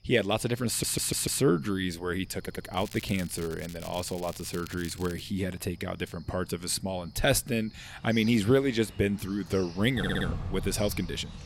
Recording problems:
animal sounds; noticeable; throughout; 15 dB below the speech
crackling; noticeable; from 2.5 to 5 s; 15 dB below the speech
audio stuttering; at 0.5 s, at 2.5 s and at 10 s

